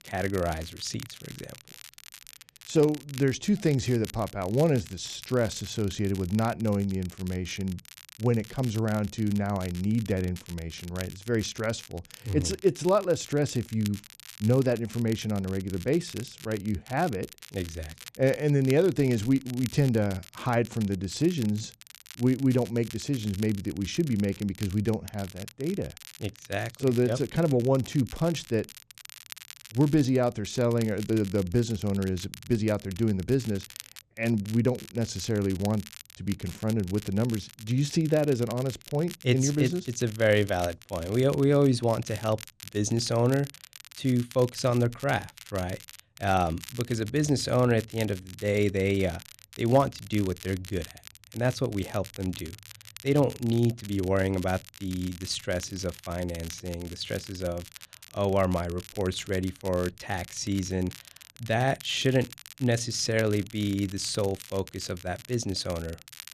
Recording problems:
crackle, like an old record; noticeable; 20 dB below the speech

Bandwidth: 14 kHz